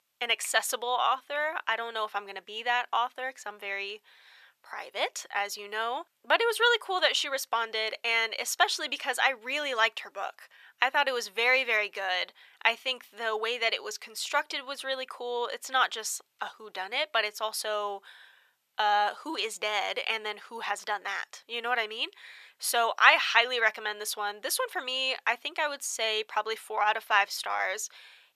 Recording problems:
thin; very; fading below 750 Hz

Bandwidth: 14 kHz